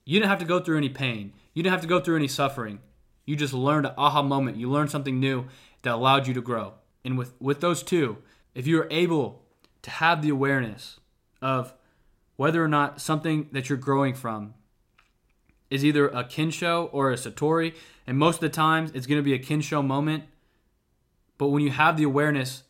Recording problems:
none

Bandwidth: 16 kHz